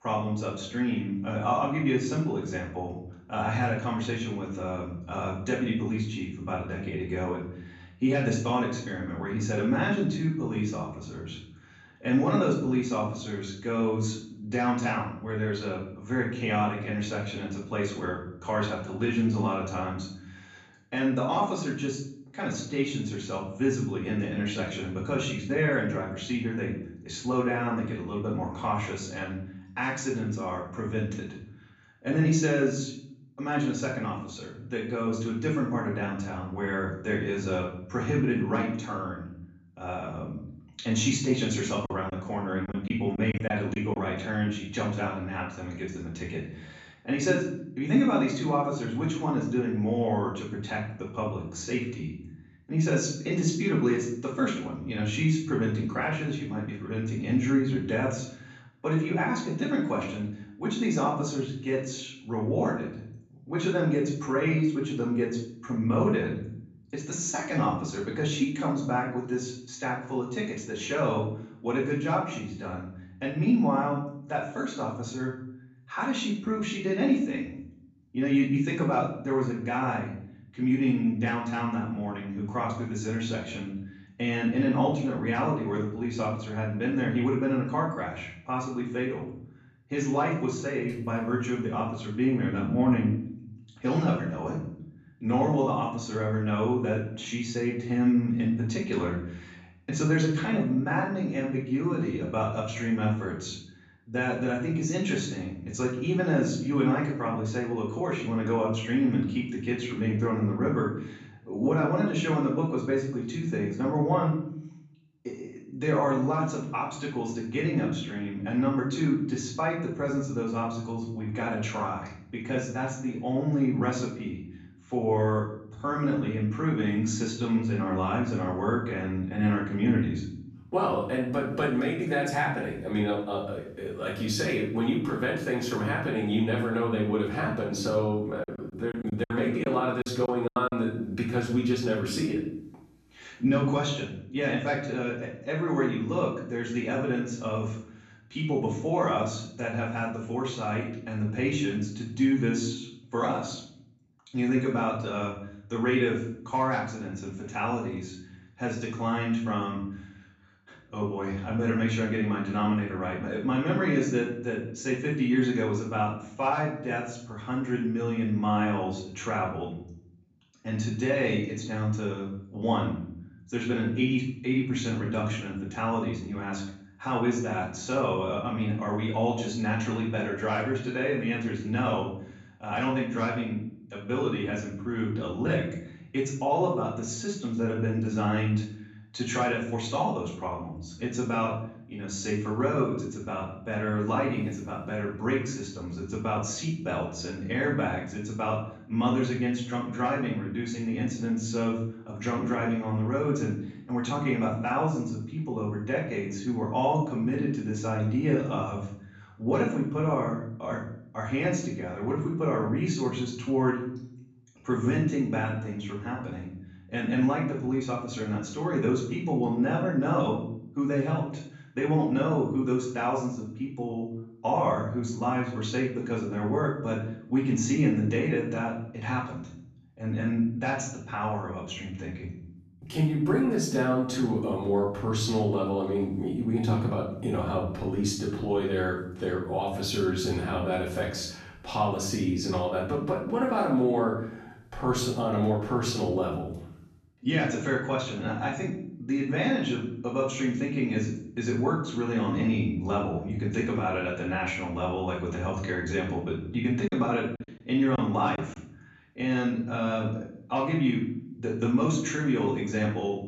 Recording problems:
off-mic speech; far
room echo; noticeable; dies away in 0.6 s
choppy; very; from 42 to 44 s, from 2:18 to 2:21 and from 4:17 to 4:18; 11% of the speech affected

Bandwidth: 13.5 kHz